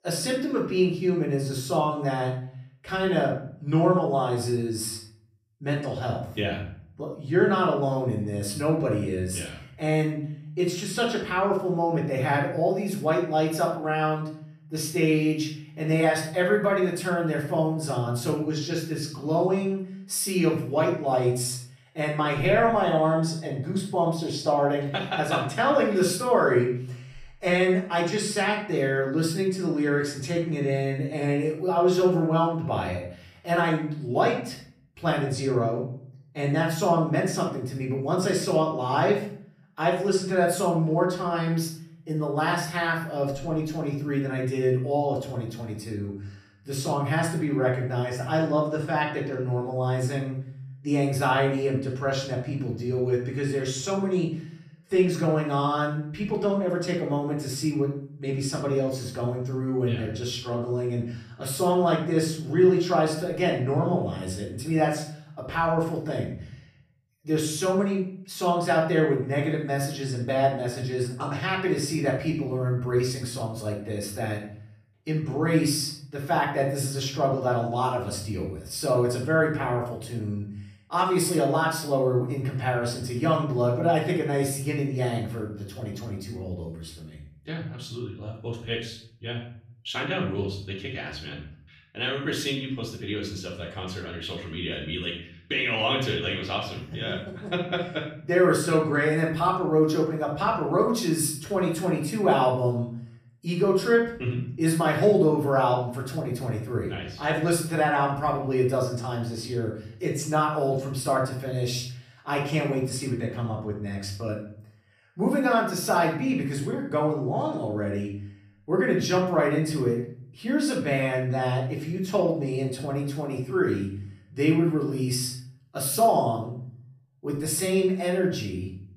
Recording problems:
off-mic speech; far
room echo; noticeable; dies away in 0.5 s

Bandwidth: 14.5 kHz